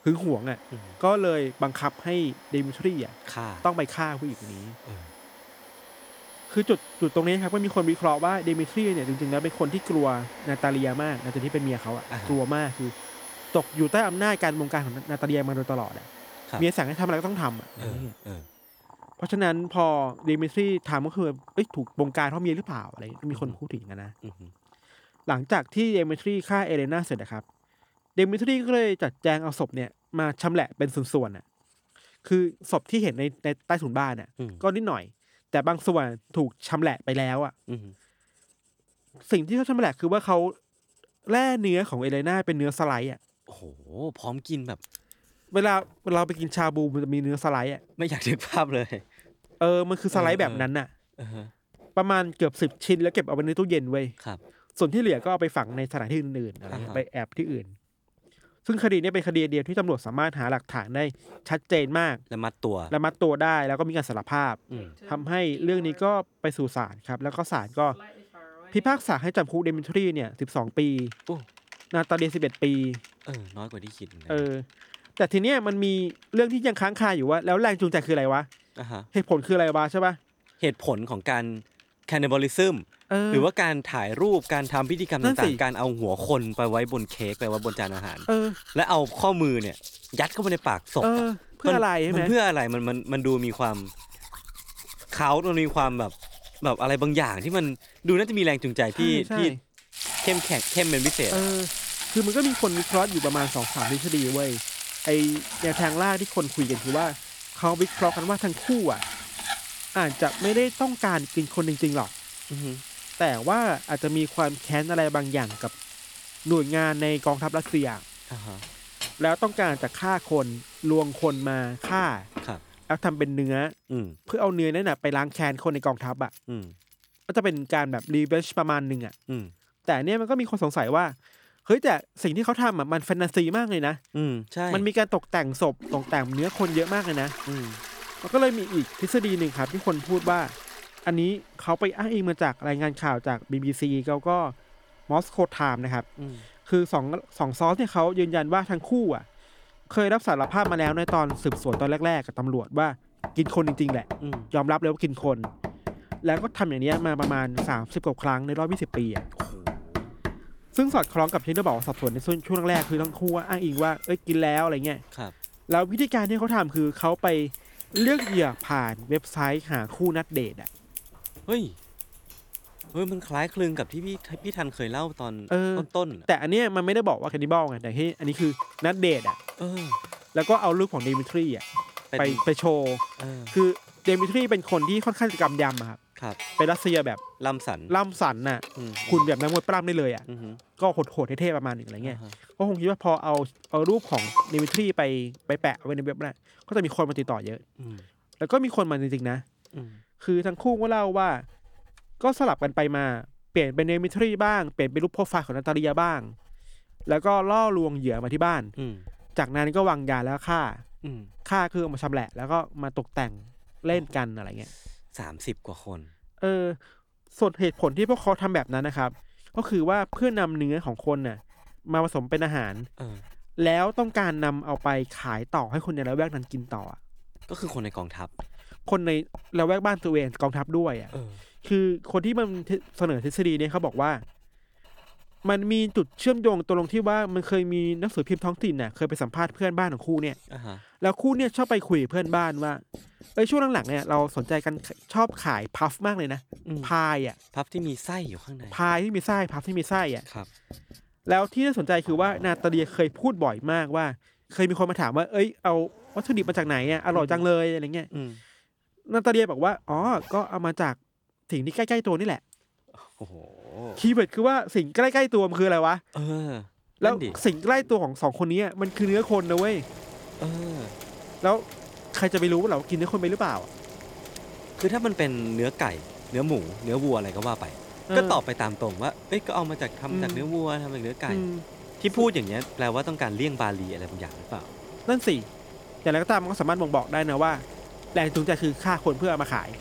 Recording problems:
household noises; noticeable; throughout; 10 dB below the speech

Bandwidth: 18.5 kHz